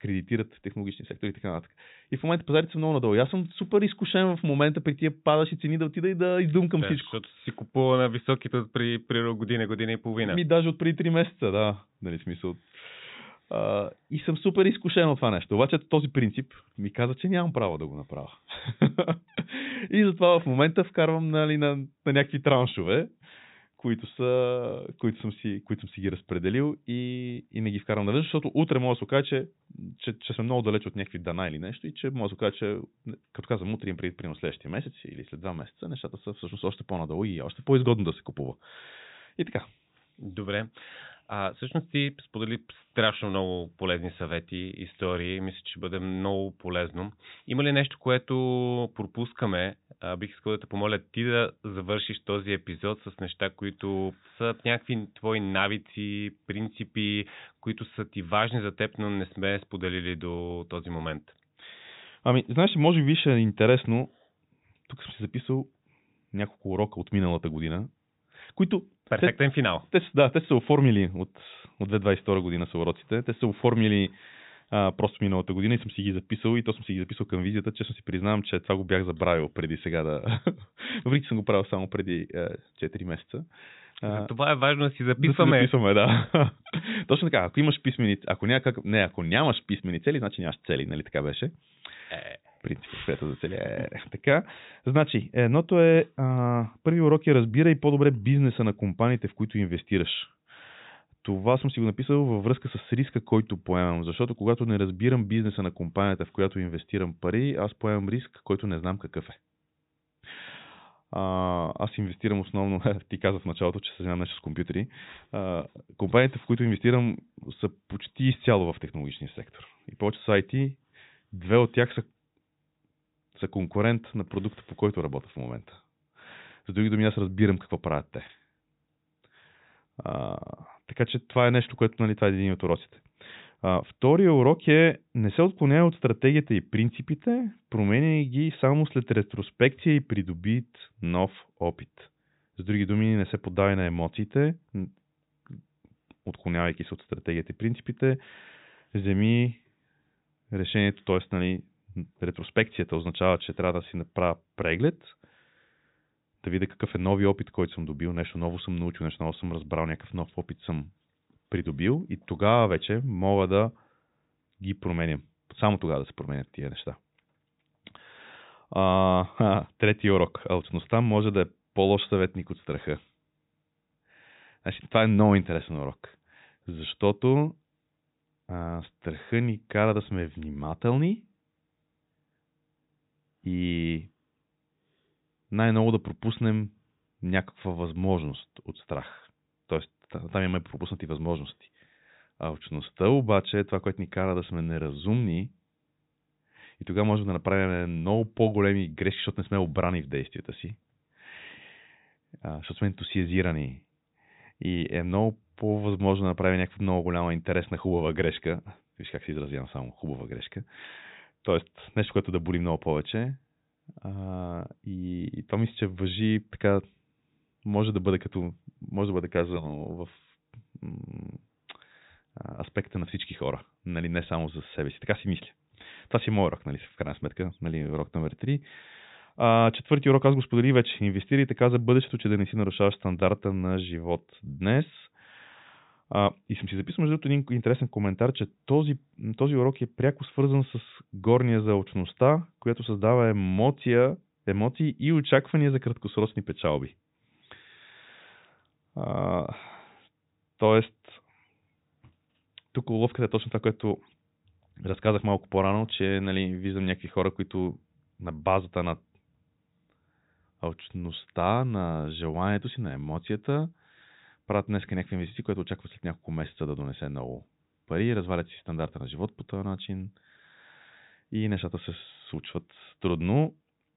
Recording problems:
high frequencies cut off; severe; nothing above 4 kHz

